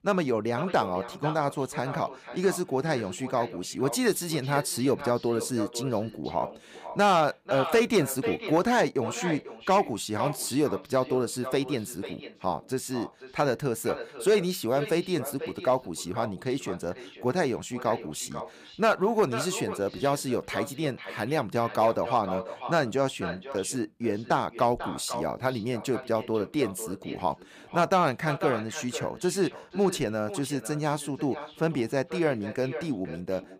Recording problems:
echo of what is said; strong; throughout; 490 ms later, 10 dB below the speech

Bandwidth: 15 kHz